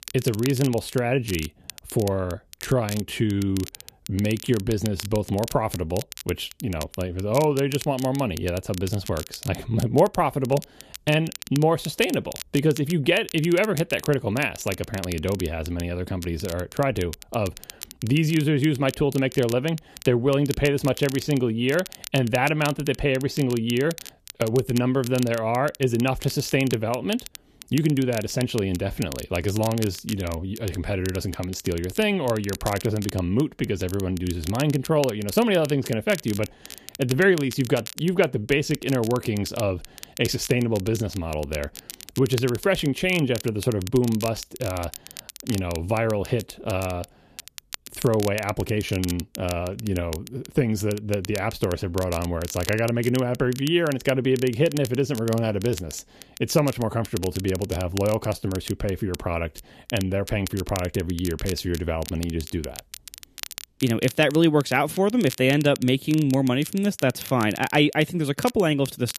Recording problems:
crackle, like an old record; noticeable; 15 dB below the speech

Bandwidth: 14.5 kHz